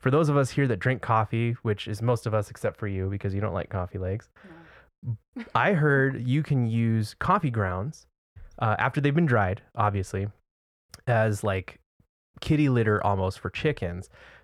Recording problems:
muffled; slightly; fading above 2.5 kHz

